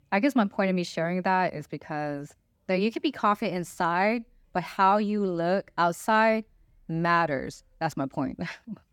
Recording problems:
none

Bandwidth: 18.5 kHz